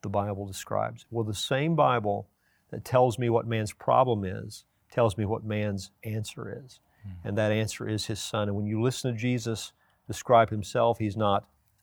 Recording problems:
none

